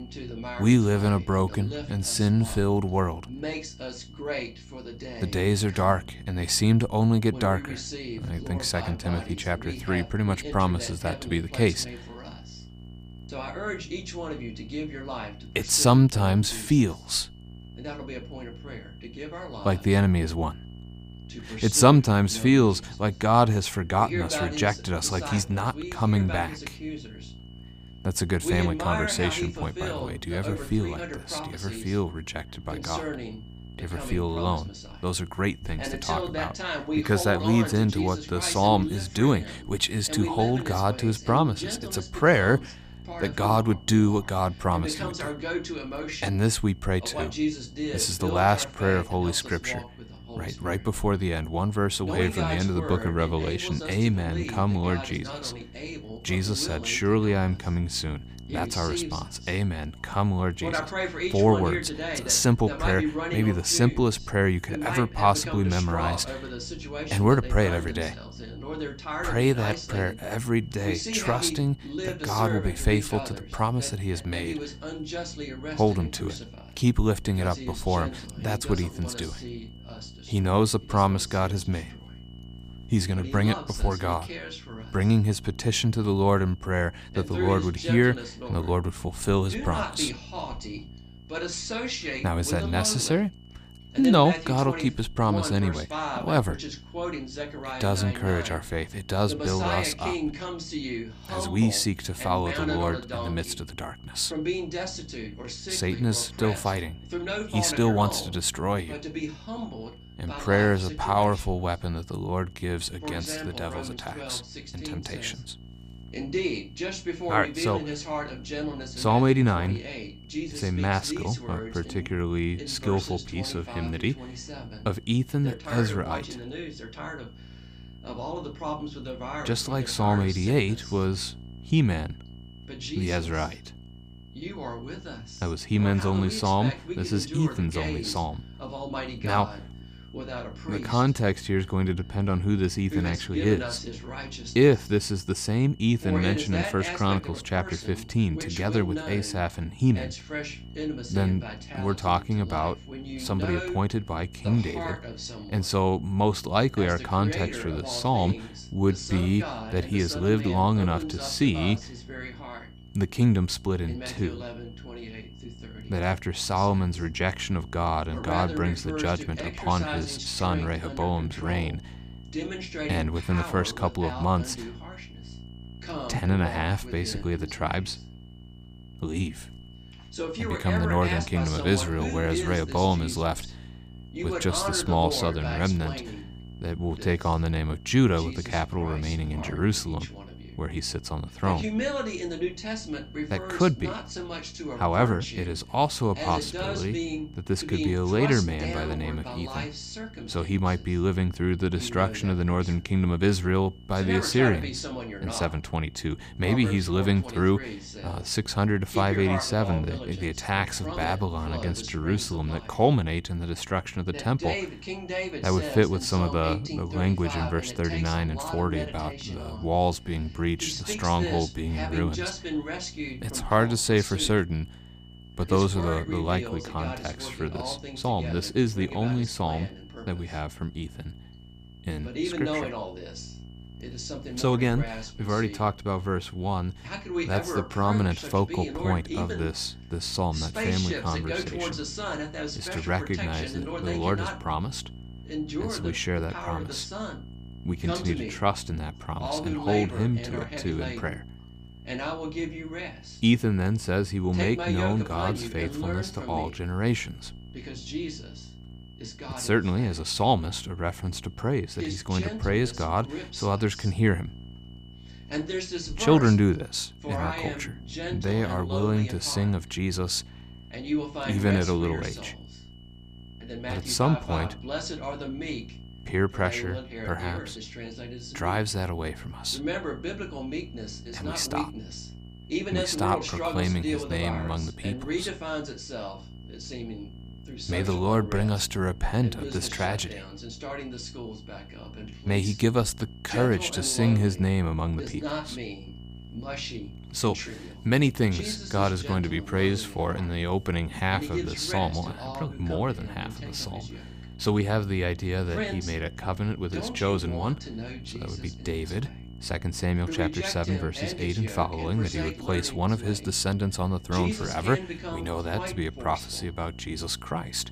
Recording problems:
voice in the background; loud; throughout; 9 dB below the speech
electrical hum; faint; throughout; 60 Hz, 25 dB below the speech
high-pitched whine; faint; throughout; 3 kHz, 30 dB below the speech

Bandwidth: 15 kHz